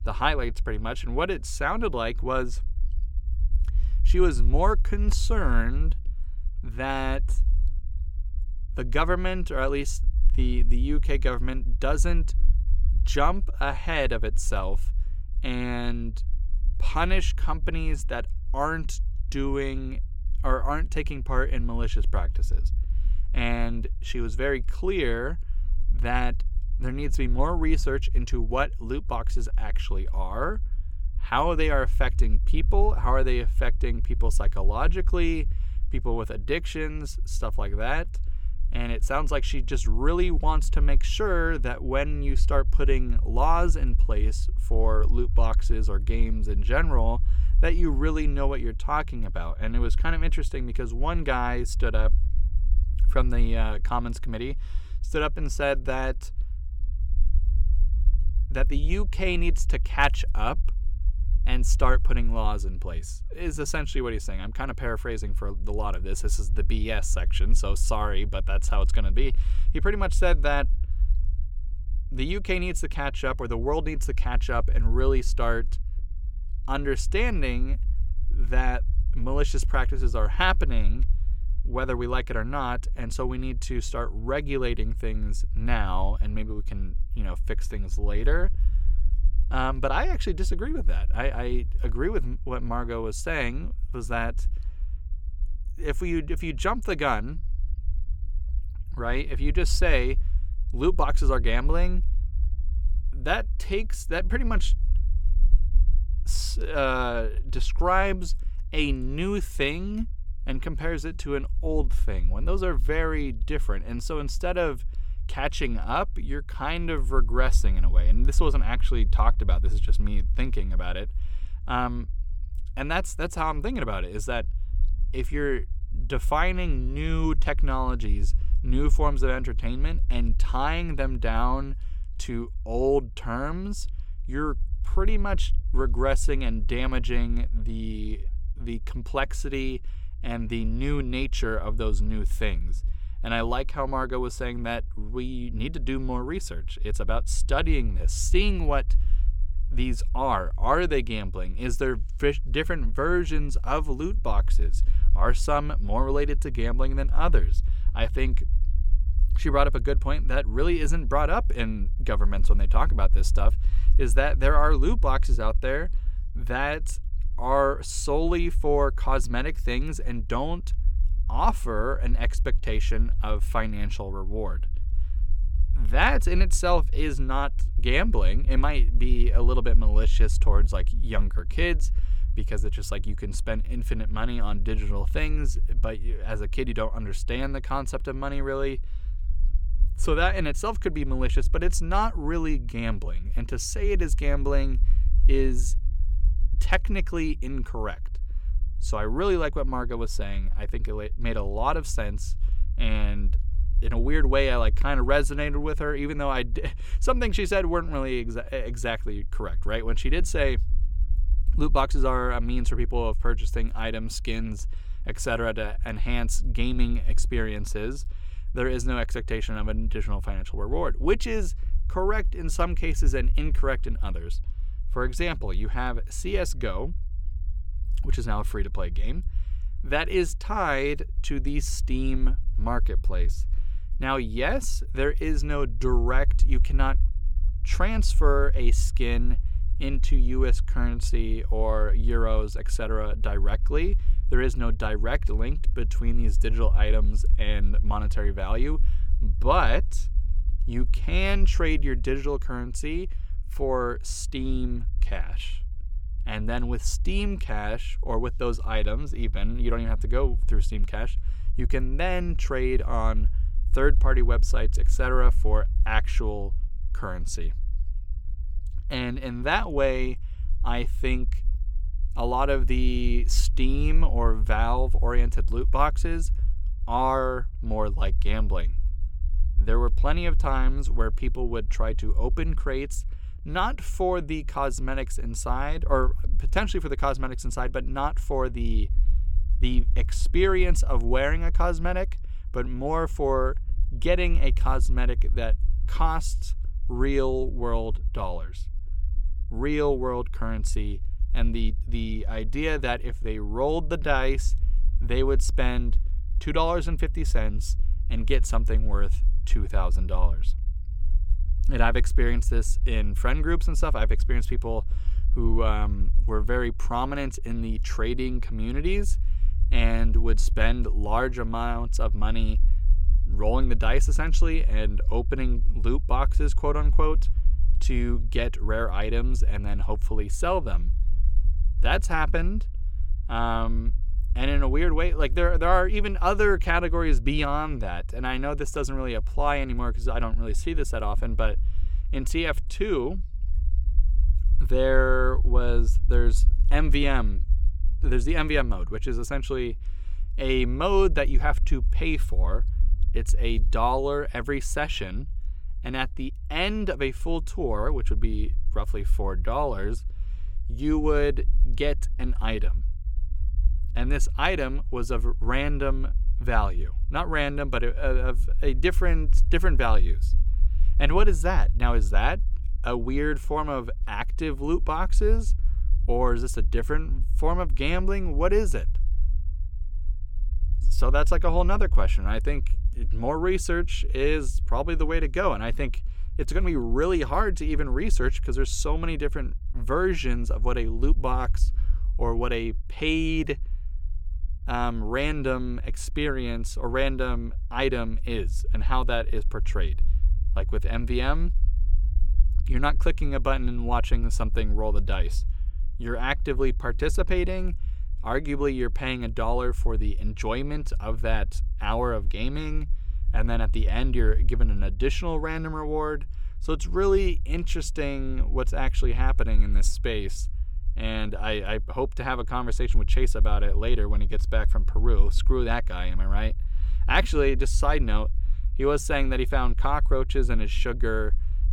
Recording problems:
low rumble; faint; throughout; 25 dB below the speech

